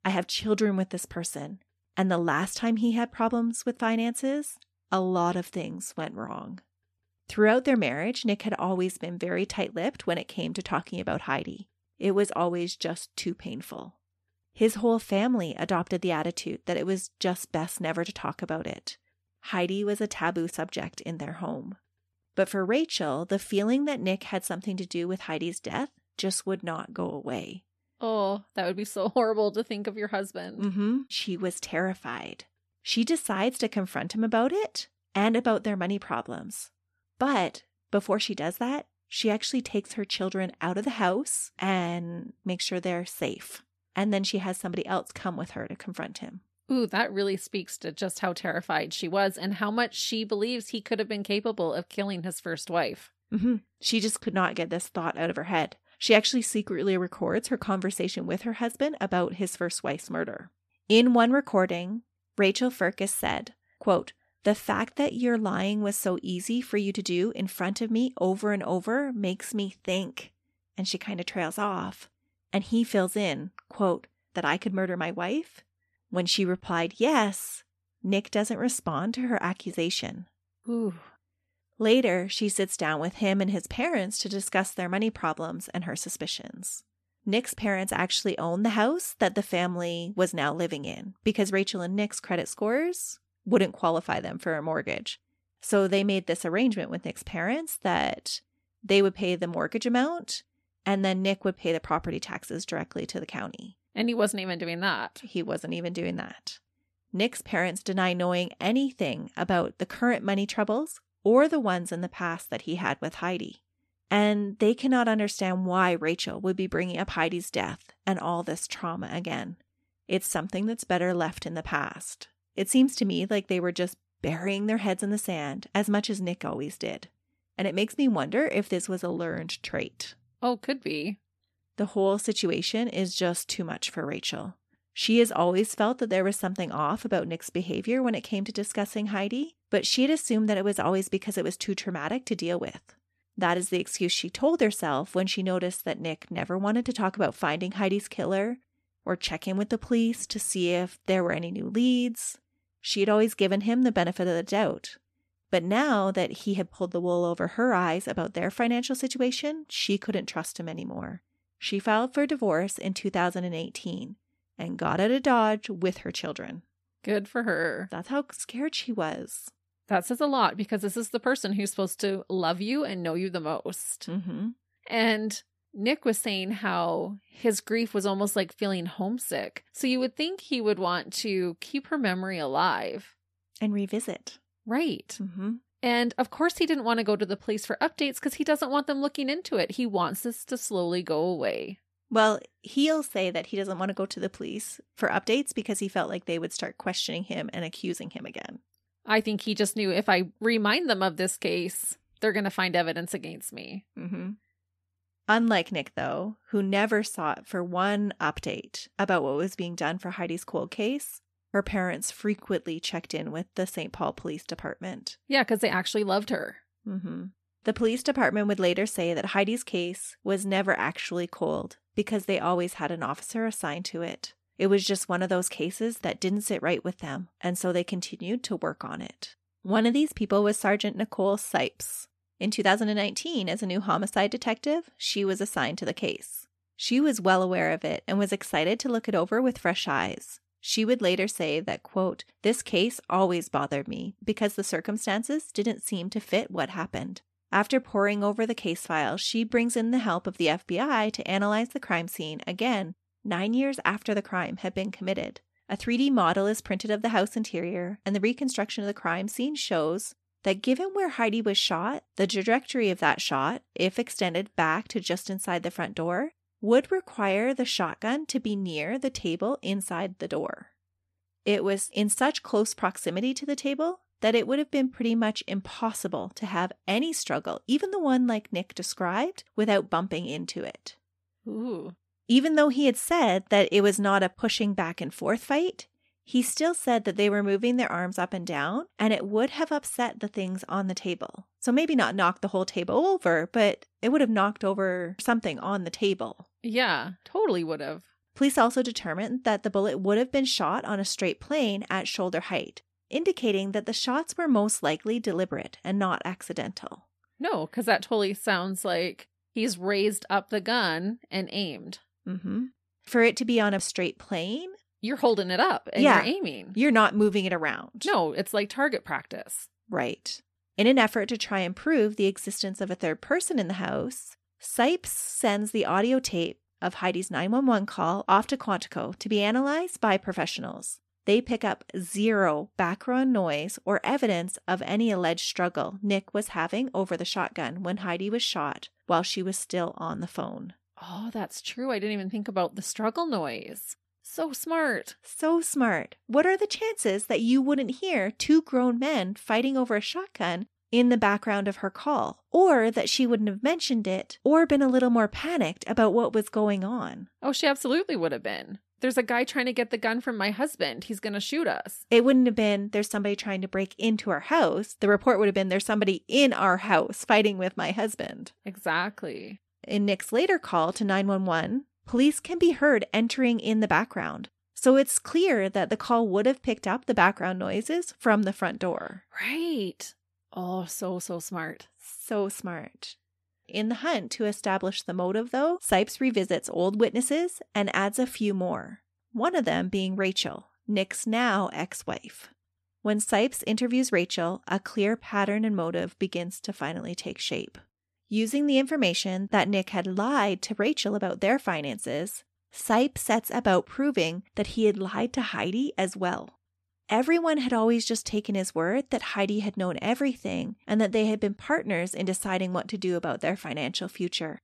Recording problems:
none

